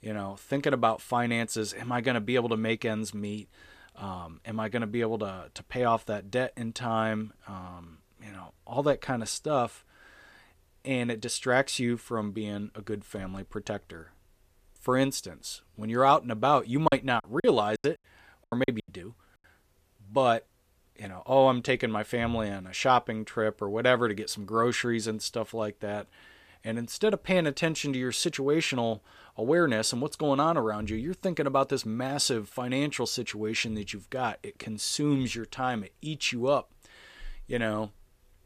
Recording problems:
choppy; very; from 17 to 19 s; 24% of the speech affected

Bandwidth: 14.5 kHz